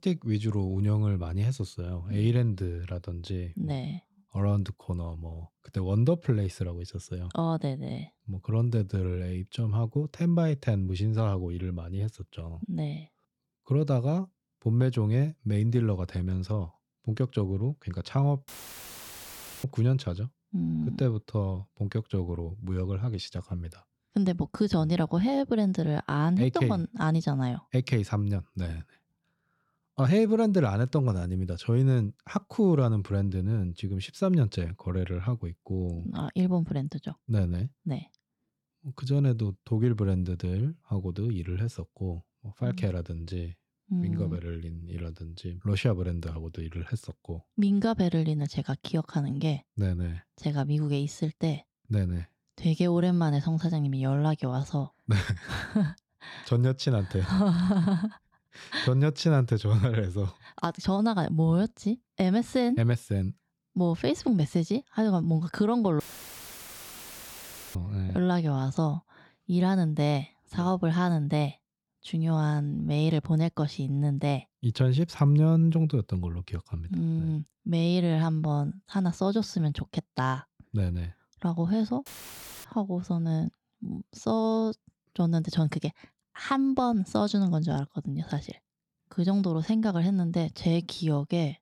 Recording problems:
audio cutting out; filled with static; at 18 s for 1 s, at 1:06 for 2 s and at 1:22 for 0.5 s

